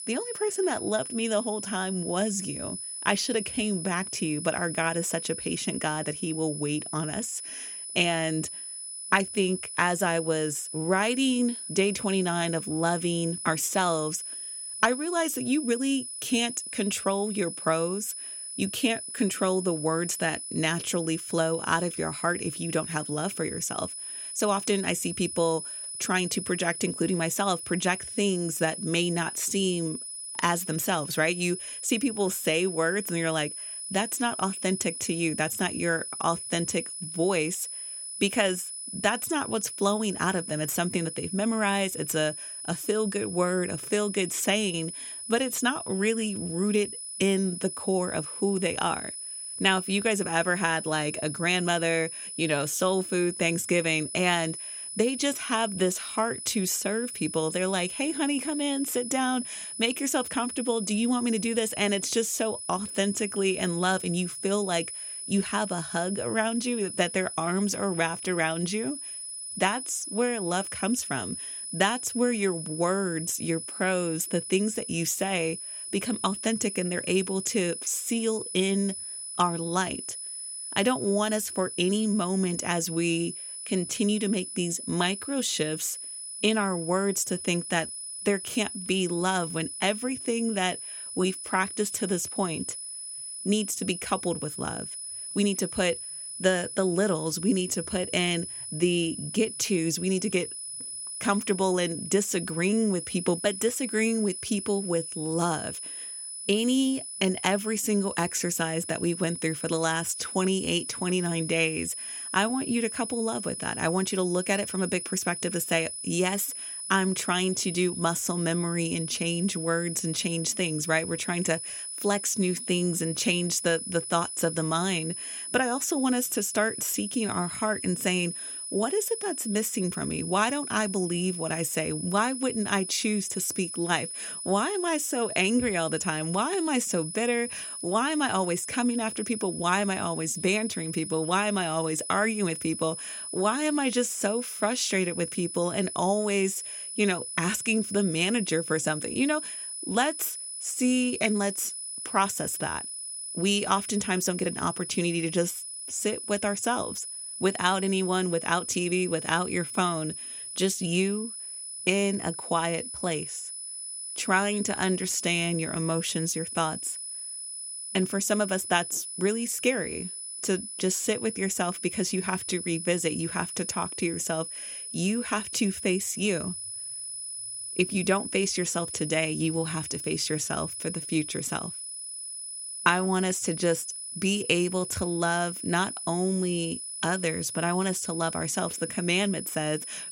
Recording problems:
high-pitched whine; loud; throughout; 10 kHz, 7 dB below the speech

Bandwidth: 16.5 kHz